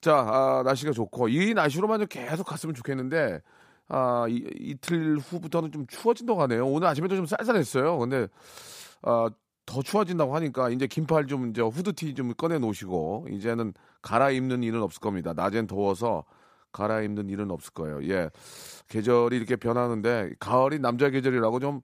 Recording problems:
none

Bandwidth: 15 kHz